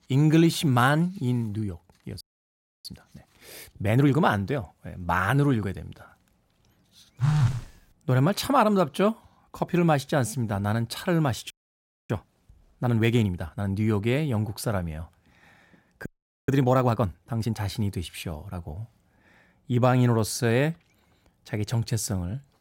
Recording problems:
audio freezing; at 2 s for 0.5 s, at 12 s for 0.5 s and at 16 s
phone ringing; loud; at 7 s; peak 2 dB above the speech

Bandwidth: 16 kHz